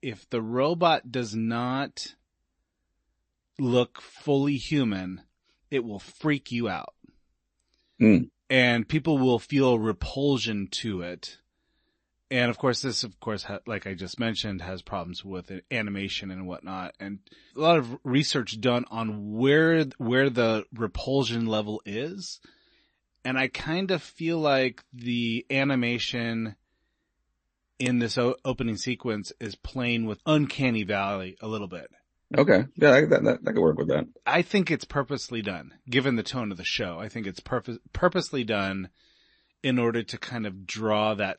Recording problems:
garbled, watery; slightly; nothing above 8 kHz

